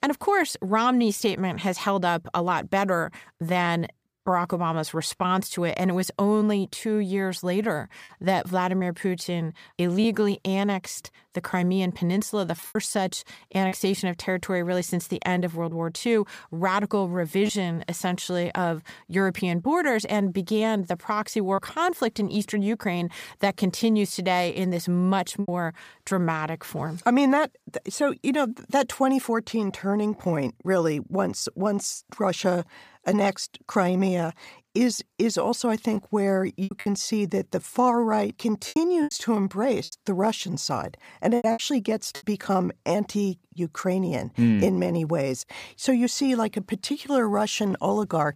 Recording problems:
choppy; occasionally; 2% of the speech affected

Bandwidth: 15 kHz